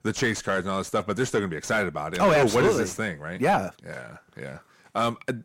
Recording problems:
distortion; heavy; 6 dB below the speech

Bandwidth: 16 kHz